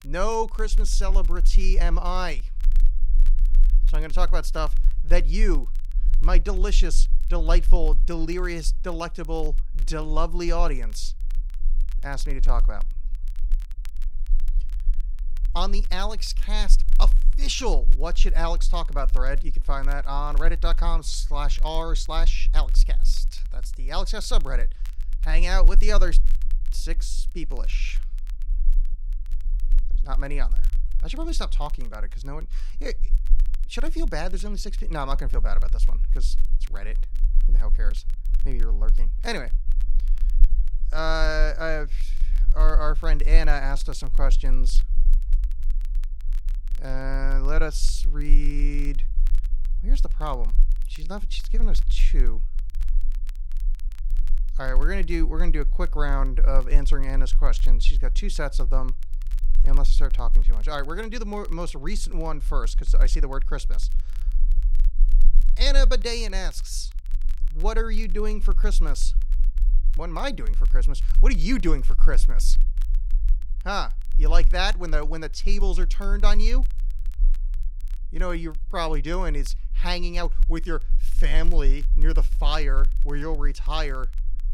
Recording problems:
low rumble; faint; throughout; 25 dB below the speech
crackle, like an old record; faint; 25 dB below the speech

